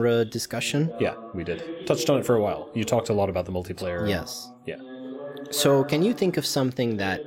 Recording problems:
voice in the background; noticeable; throughout; 15 dB below the speech
abrupt cut into speech; at the start

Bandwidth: 16 kHz